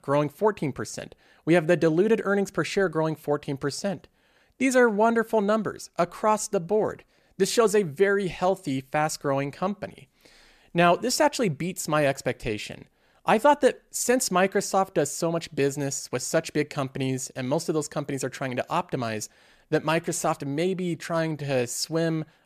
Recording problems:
none

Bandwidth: 14.5 kHz